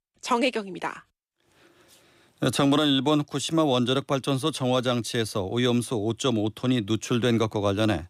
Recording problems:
none

